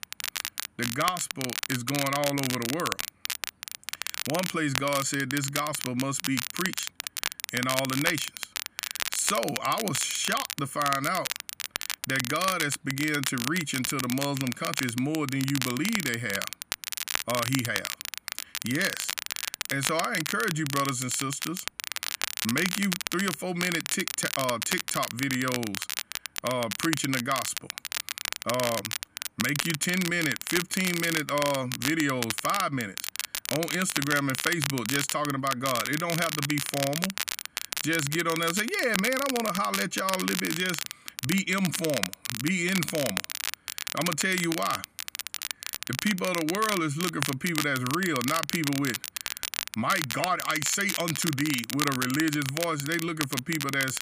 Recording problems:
crackle, like an old record; loud; 3 dB below the speech

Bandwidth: 15 kHz